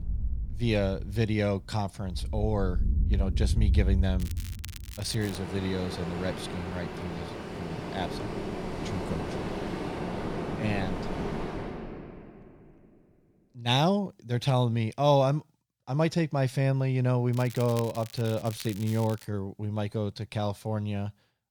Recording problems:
rain or running water; loud; until 12 s; 4 dB below the speech
crackling; noticeable; from 4 to 5.5 s and from 17 to 19 s; 15 dB below the speech

